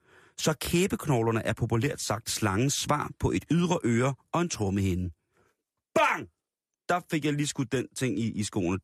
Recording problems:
none

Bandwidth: 14.5 kHz